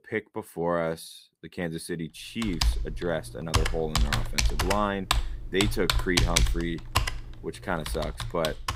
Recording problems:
household noises; very loud; from 2.5 s on; 3 dB above the speech

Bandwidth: 15.5 kHz